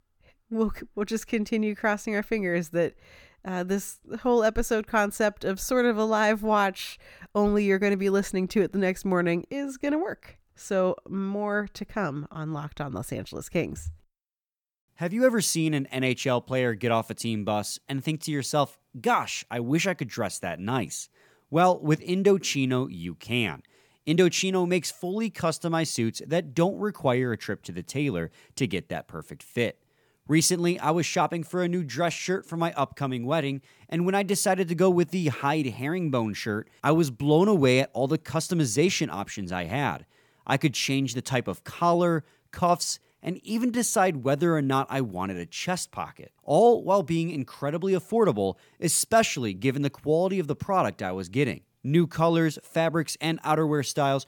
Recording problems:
none

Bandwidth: 18.5 kHz